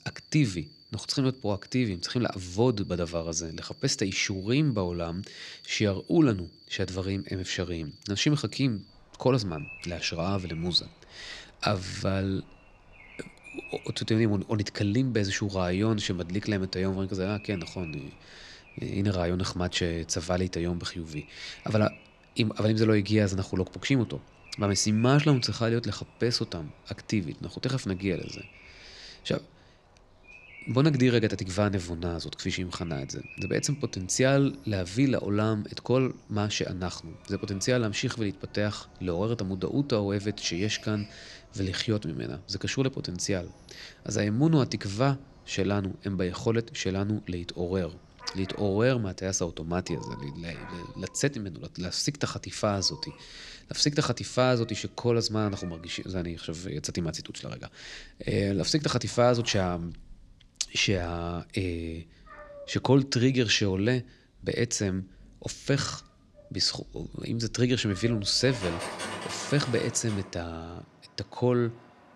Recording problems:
animal sounds; faint; throughout; 20 dB below the speech

